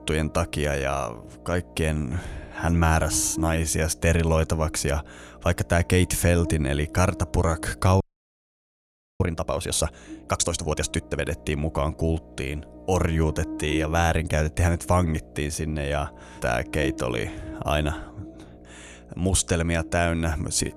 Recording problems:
electrical hum; noticeable; throughout; 60 Hz, 15 dB below the speech
audio freezing; at 8 s for 1 s

